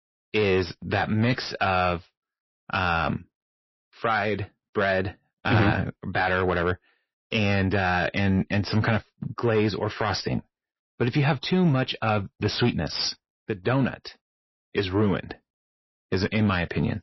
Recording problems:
distortion; slight; 10 dB below the speech
garbled, watery; slightly; nothing above 5.5 kHz

